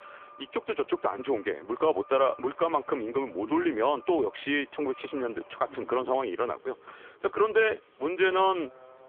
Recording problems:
phone-call audio; poor line; nothing above 3.5 kHz
traffic noise; faint; throughout; 25 dB below the speech

